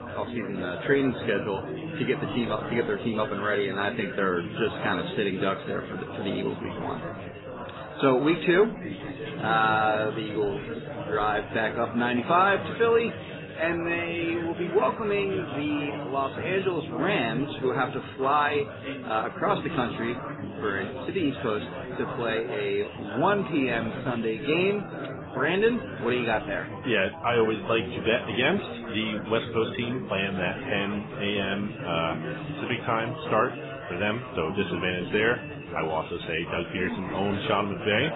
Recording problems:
garbled, watery; badly; nothing above 4 kHz
chatter from many people; loud; throughout; 8 dB below the speech
background music; faint; until 29 s; 25 dB below the speech

